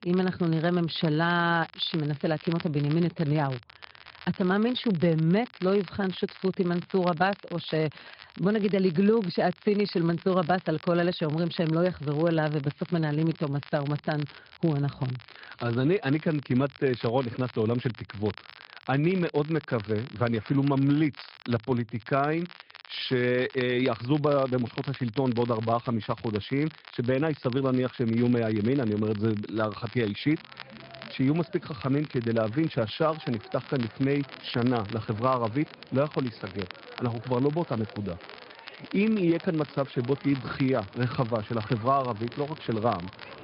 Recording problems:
high frequencies cut off; noticeable; nothing above 5 kHz
garbled, watery; slightly
crackle, like an old record; noticeable; 20 dB below the speech
crowd noise; faint; from 31 s on; 20 dB below the speech

